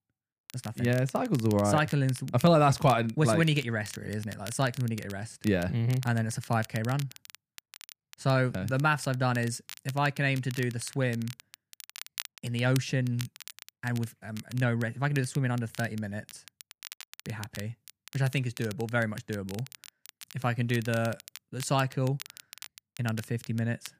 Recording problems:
crackle, like an old record; noticeable; 15 dB below the speech

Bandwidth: 15 kHz